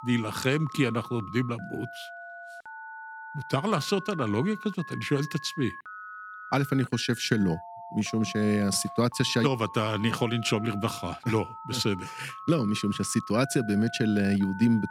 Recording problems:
alarms or sirens; noticeable; throughout; 15 dB below the speech

